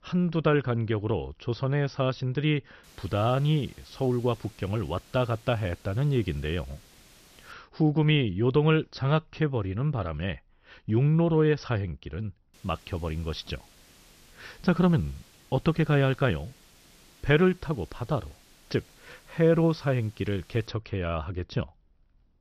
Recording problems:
high frequencies cut off; noticeable; nothing above 6 kHz
hiss; faint; from 3 to 7.5 s and from 13 to 21 s; 25 dB below the speech

